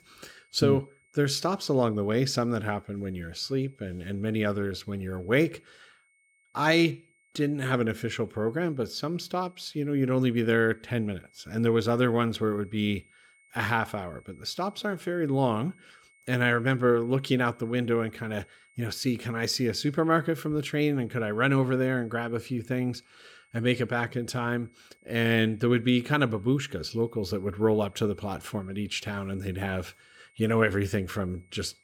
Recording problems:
high-pitched whine; faint; throughout; 2 kHz, 35 dB below the speech

